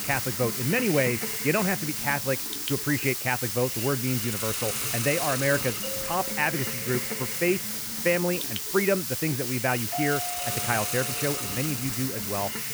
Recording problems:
high frequencies cut off; severe; nothing above 3 kHz
hiss; loud; throughout; as loud as the speech
doorbell; noticeable; from 6 to 7.5 s and from 10 to 12 s; peak 6 dB below the speech

